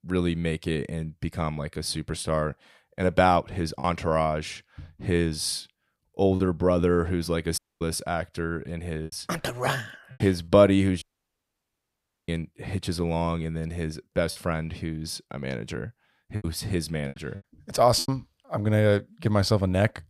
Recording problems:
choppy; occasionally; 5% of the speech affected
audio cutting out; at 7.5 s and at 11 s for 1.5 s

